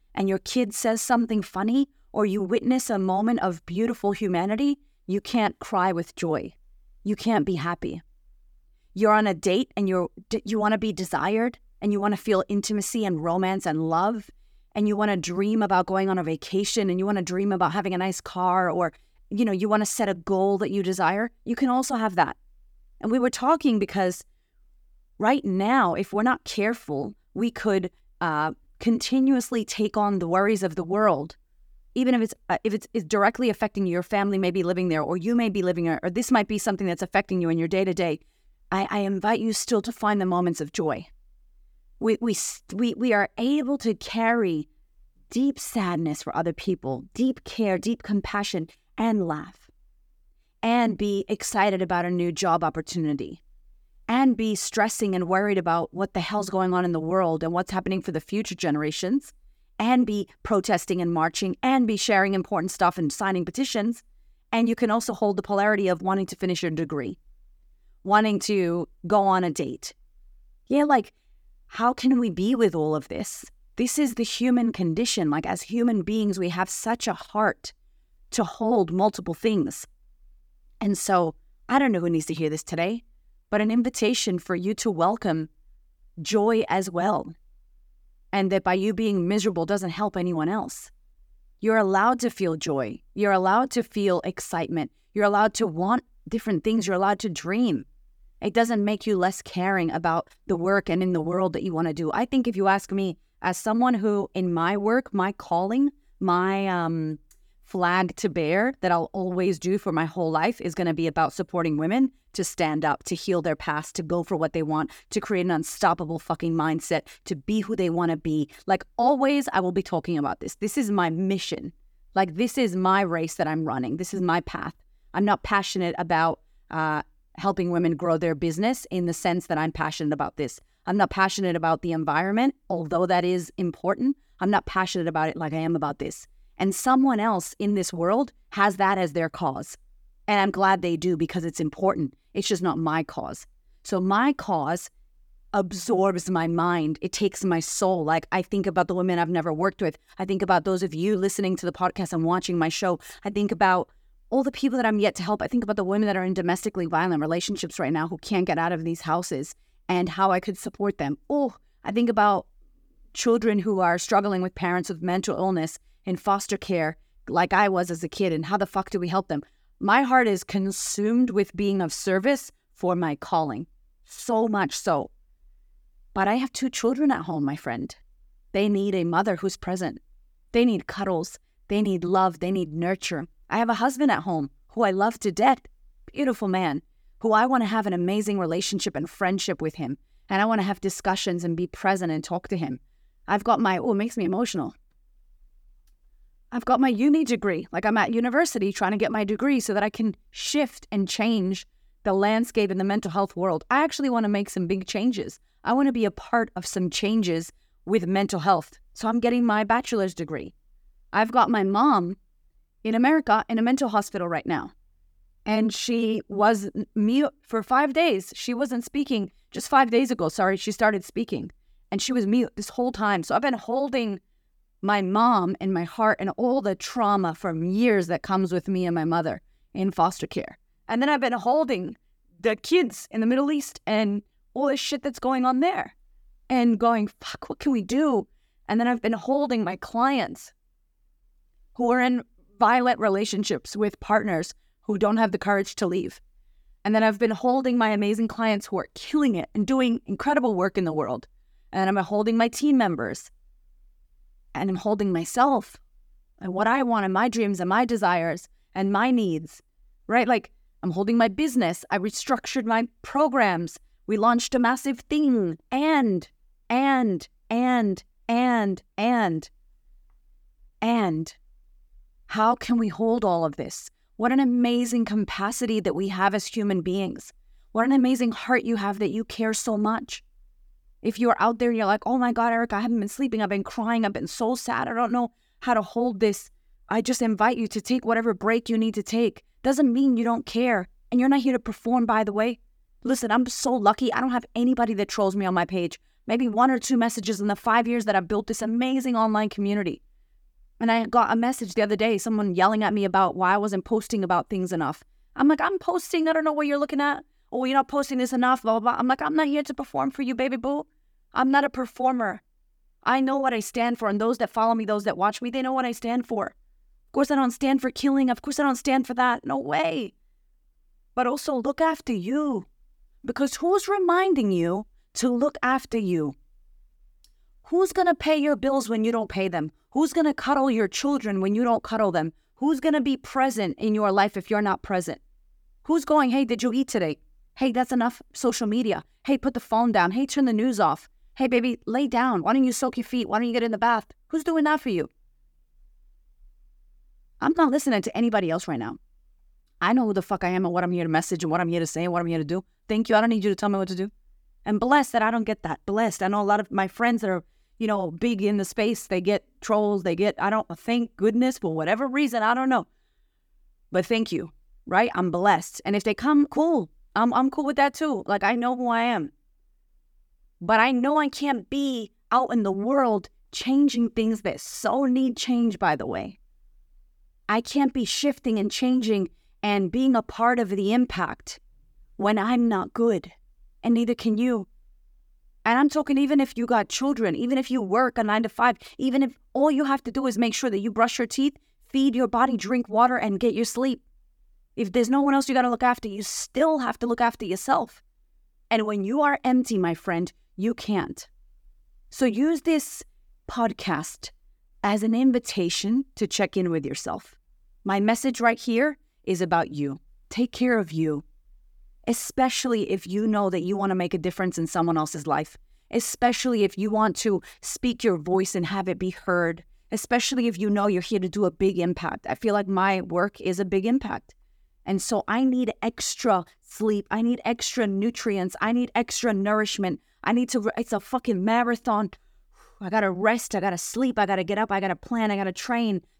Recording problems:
none

